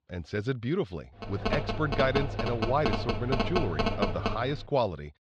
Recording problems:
muffled; slightly; fading above 4 kHz
phone ringing; loud; from 1 to 4.5 s; peak 2 dB above the speech

